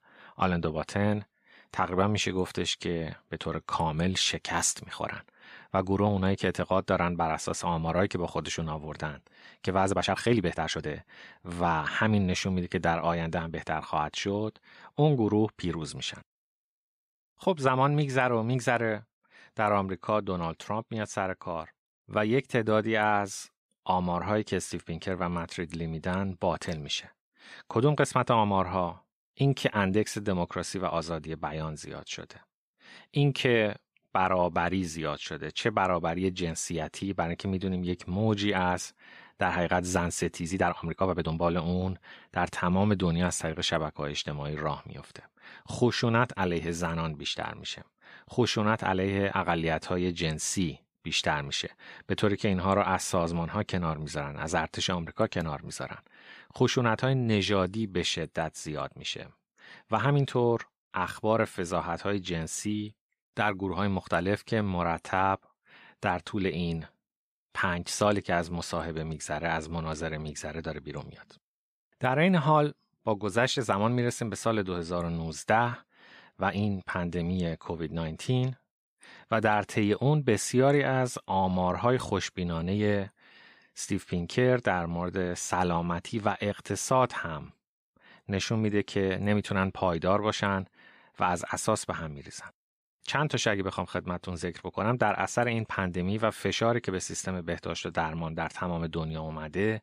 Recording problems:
uneven, jittery; strongly; from 10 s to 1:05

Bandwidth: 14.5 kHz